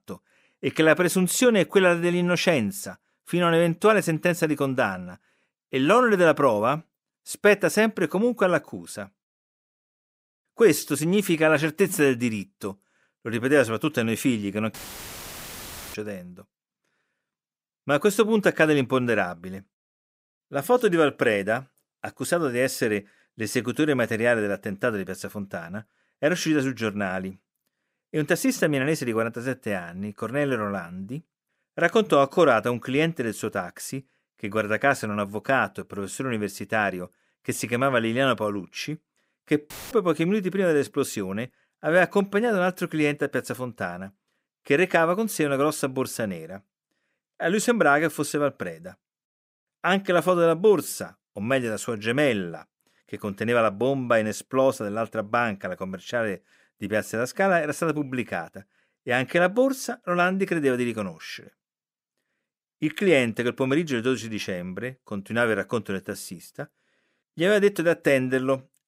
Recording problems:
audio cutting out; filled with static; at 15 s for 1 s and at 40 s

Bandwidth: 15.5 kHz